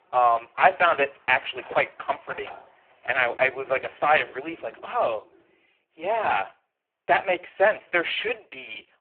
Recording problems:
phone-call audio; poor line
thin; very; fading below 300 Hz
animal sounds; faint; until 5.5 s; 25 dB below the speech

